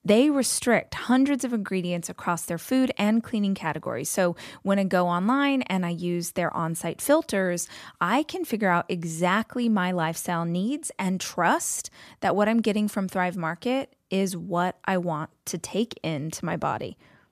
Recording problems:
none

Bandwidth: 14.5 kHz